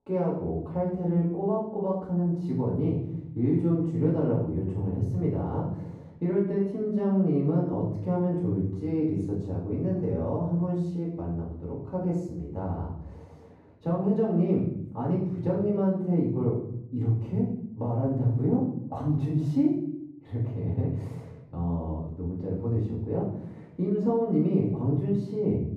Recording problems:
off-mic speech; far
muffled; very; fading above 1 kHz
room echo; noticeable; dies away in 0.7 s

